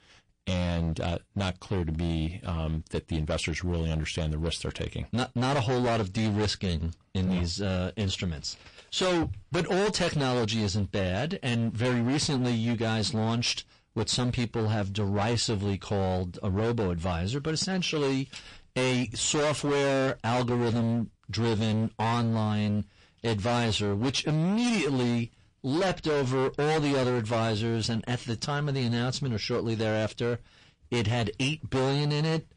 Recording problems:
distortion; heavy; 23% of the sound clipped
garbled, watery; slightly; nothing above 8.5 kHz

